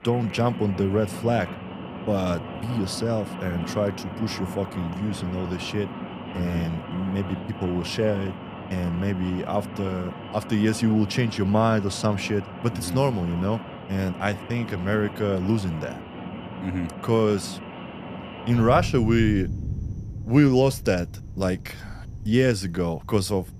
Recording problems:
rain or running water; noticeable; throughout; 10 dB below the speech

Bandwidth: 14.5 kHz